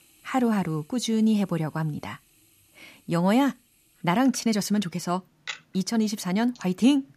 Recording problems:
household noises; faint; throughout; 20 dB below the speech

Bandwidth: 14.5 kHz